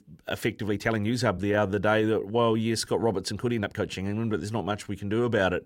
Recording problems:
uneven, jittery; strongly; from 0.5 to 5 s

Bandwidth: 16 kHz